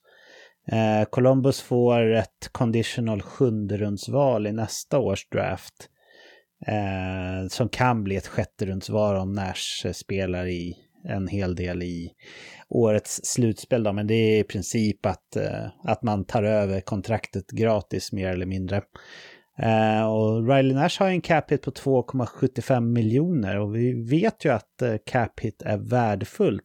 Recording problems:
none

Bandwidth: 18 kHz